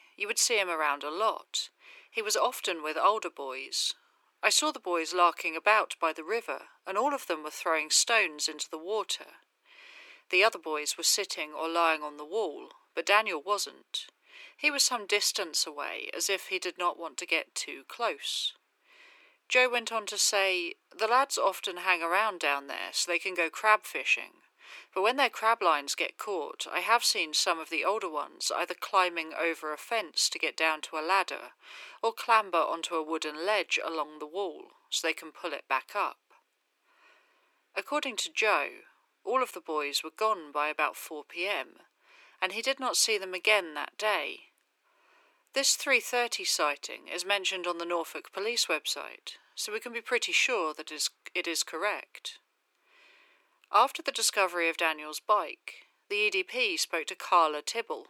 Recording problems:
thin; very; fading below 350 Hz

